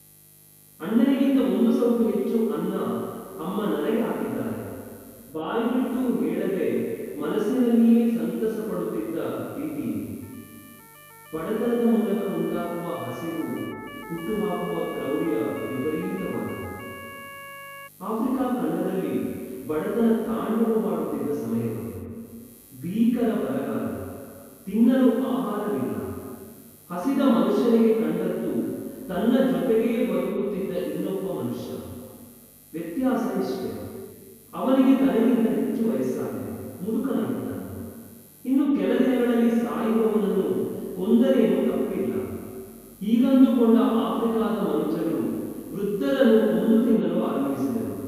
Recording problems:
room echo; strong; dies away in 2.2 s
off-mic speech; far
electrical hum; faint; throughout; 50 Hz, 30 dB below the speech
siren; faint; from 10 to 18 s; peak 15 dB below the speech

